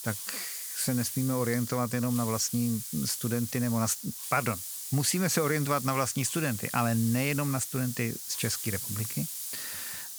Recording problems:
hiss; loud; throughout; 5 dB below the speech

